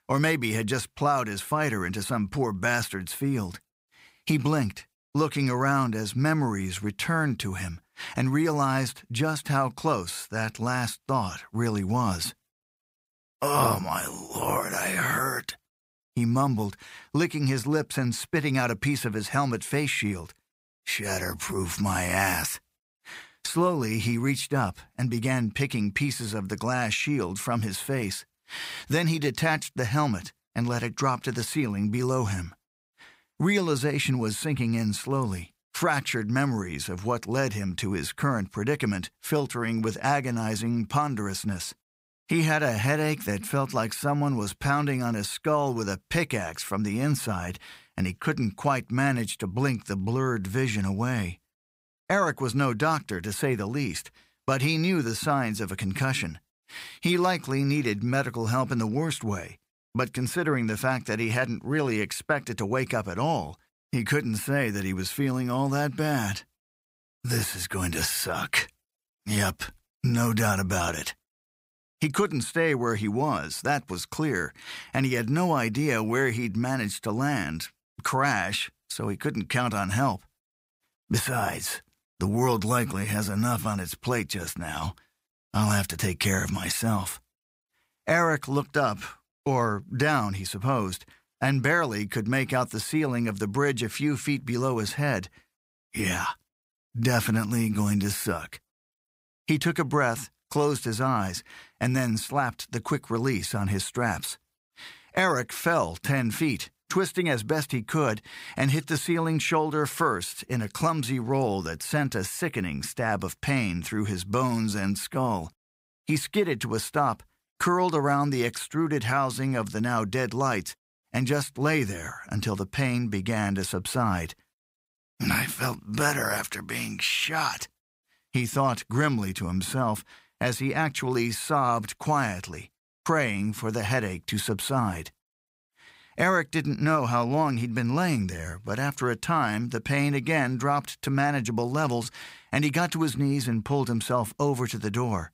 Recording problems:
none

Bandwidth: 15.5 kHz